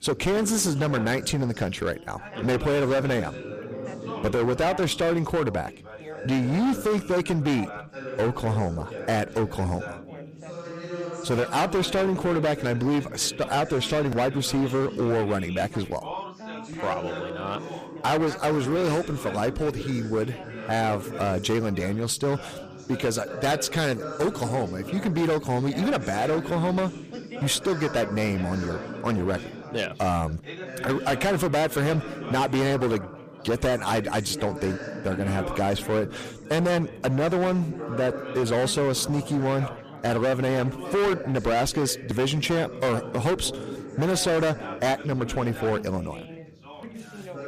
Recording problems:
distortion; heavy; 16% of the sound clipped
background chatter; noticeable; throughout; 4 voices, 10 dB below the speech

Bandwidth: 14.5 kHz